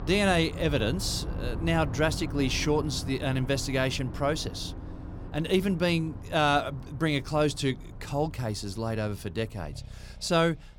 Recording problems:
traffic noise; noticeable; throughout; 10 dB below the speech

